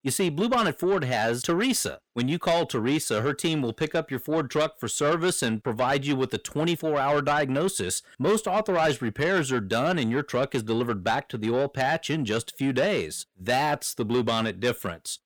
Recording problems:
distortion; slight; 10 dB below the speech

